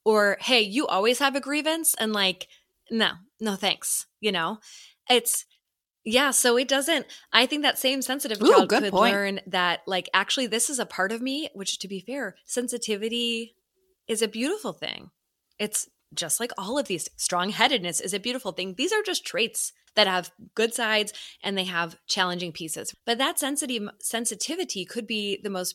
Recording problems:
none

